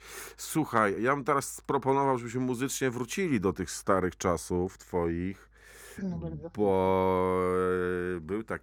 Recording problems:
none

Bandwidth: 18.5 kHz